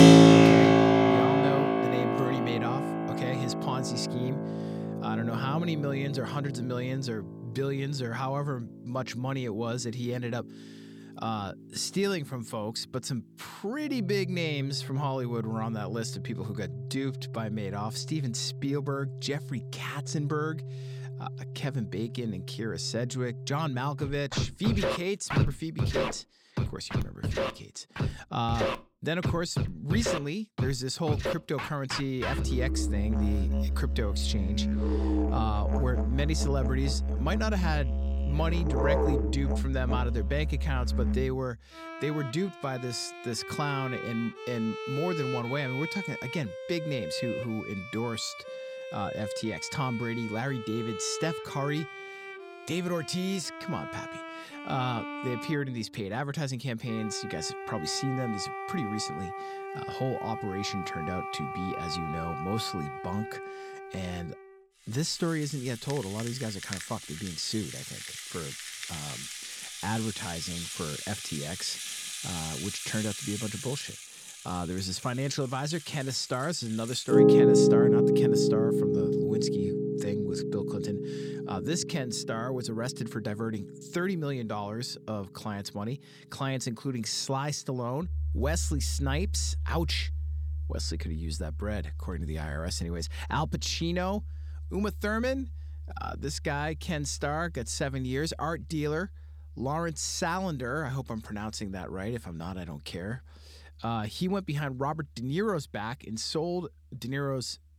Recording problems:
background music; very loud; throughout; 3 dB above the speech

